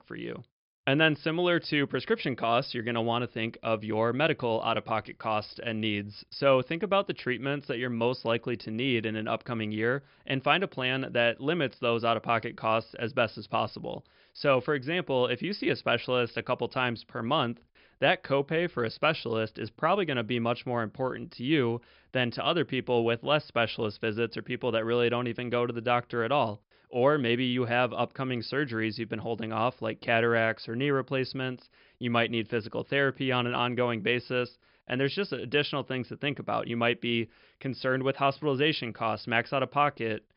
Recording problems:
high frequencies cut off; noticeable; nothing above 5.5 kHz

